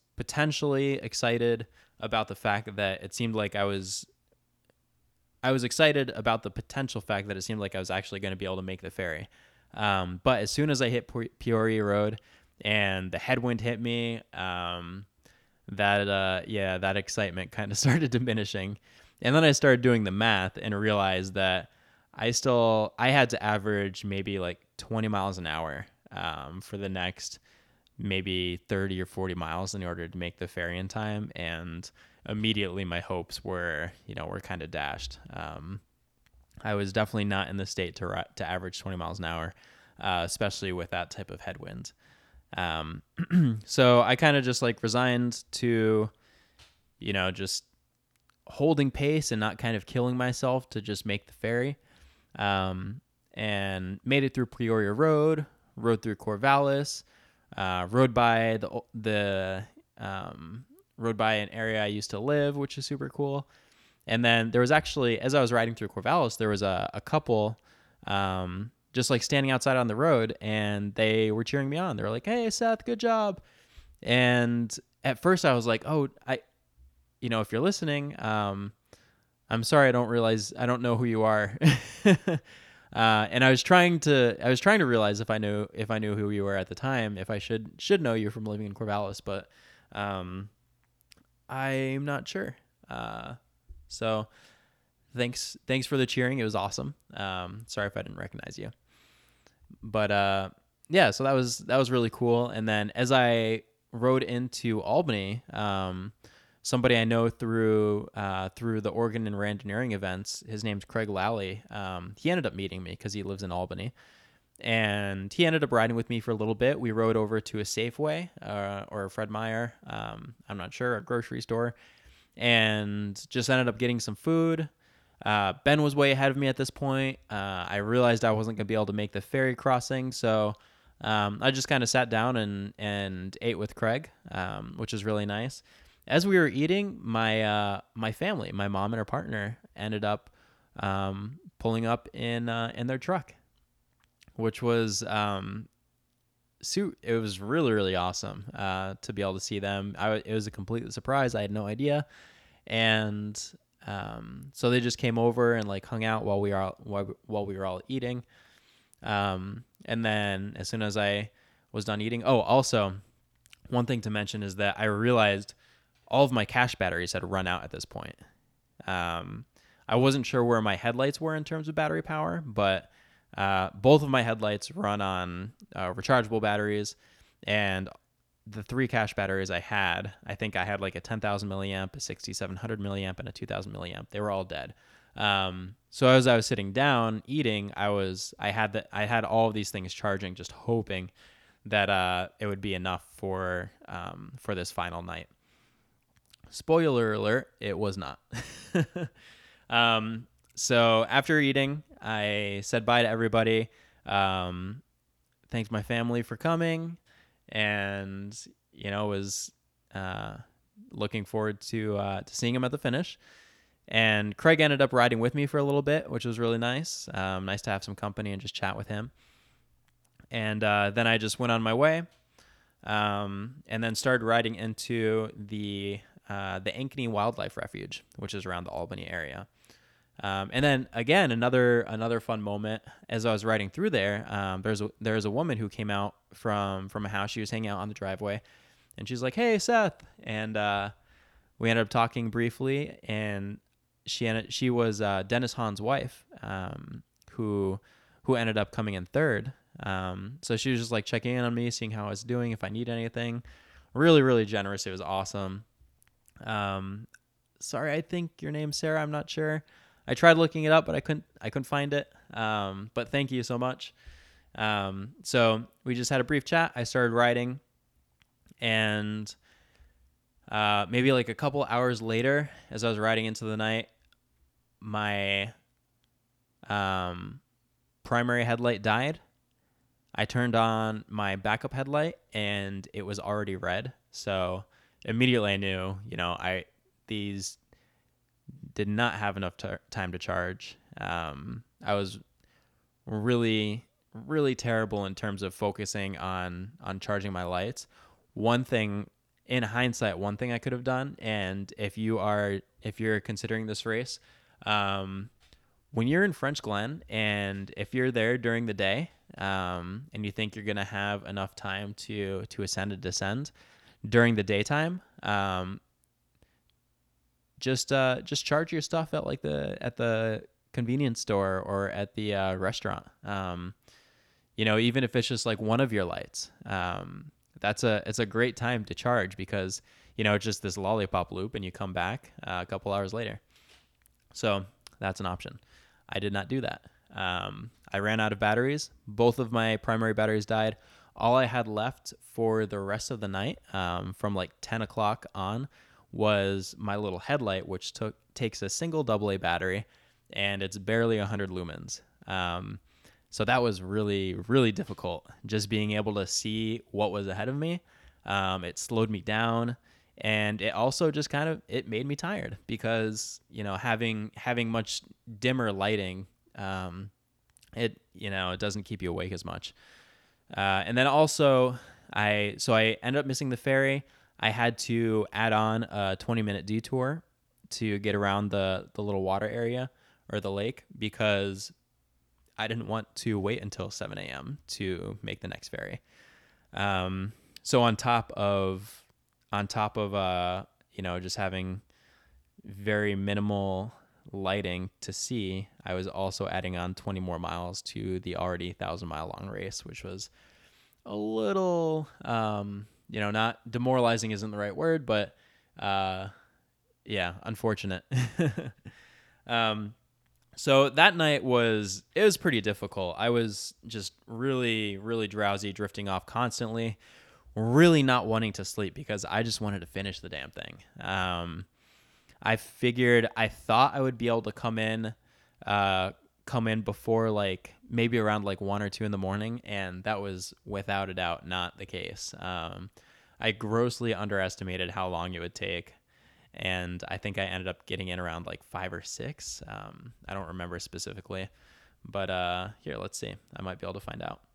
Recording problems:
none

